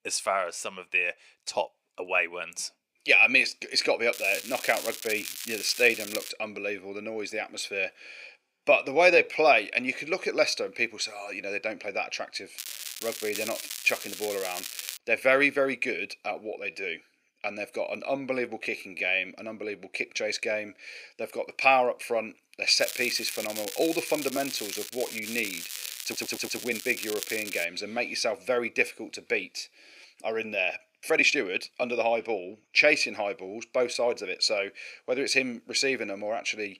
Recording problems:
thin; somewhat; fading below 450 Hz
crackling; loud; from 4 to 6.5 s, from 13 to 15 s and from 23 to 28 s; 9 dB below the speech
uneven, jittery; strongly; from 8.5 to 32 s
audio stuttering; at 26 s

